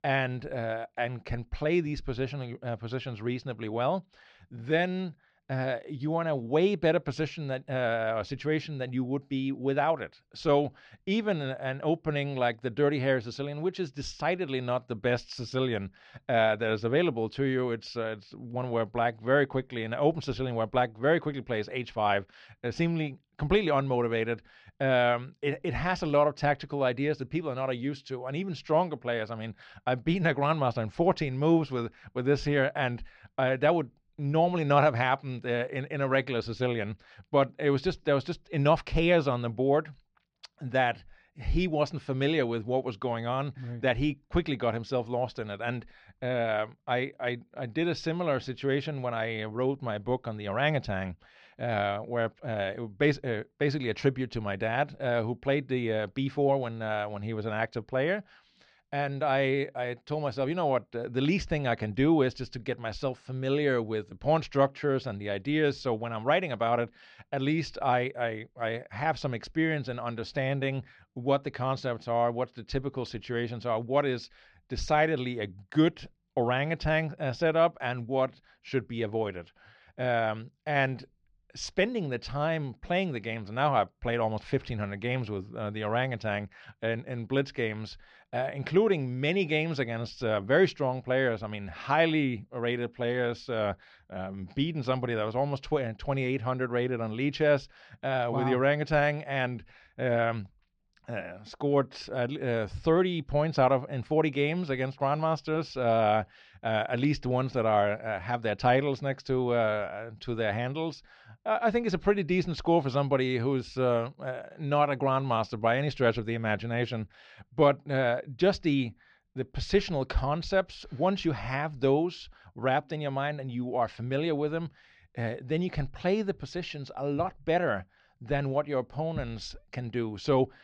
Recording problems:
muffled; slightly; fading above 4 kHz

